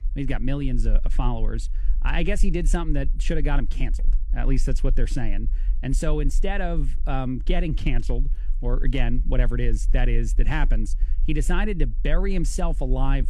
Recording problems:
low rumble; faint; throughout; 20 dB below the speech

